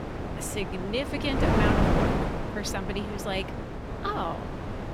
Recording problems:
wind noise on the microphone; heavy; 1 dB above the speech

